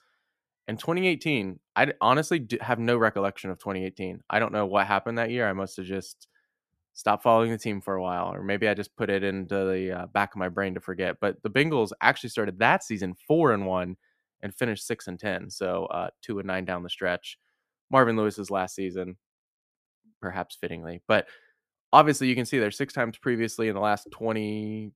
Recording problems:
none

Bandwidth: 14.5 kHz